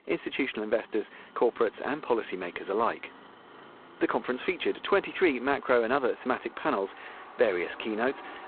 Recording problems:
phone-call audio; poor line
traffic noise; faint; throughout; 20 dB below the speech

